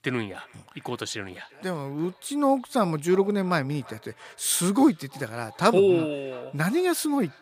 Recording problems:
echo of what is said; faint; throughout; 340 ms later, 25 dB below the speech

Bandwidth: 15 kHz